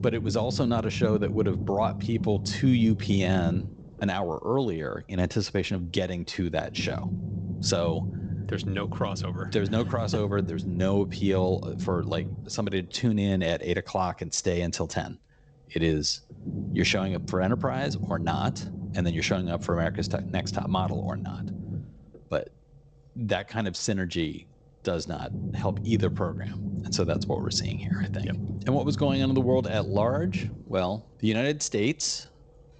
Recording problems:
garbled, watery; slightly; nothing above 7.5 kHz
low rumble; noticeable; throughout; 10 dB below the speech

